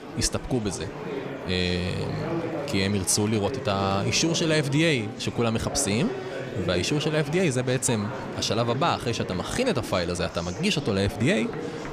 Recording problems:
murmuring crowd; loud; throughout; 9 dB below the speech

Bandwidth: 14.5 kHz